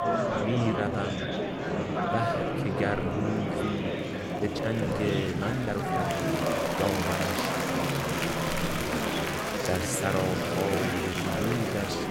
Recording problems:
murmuring crowd; very loud; throughout; 3 dB above the speech
animal sounds; loud; throughout; 4 dB below the speech
uneven, jittery; strongly; from 0.5 to 11 s

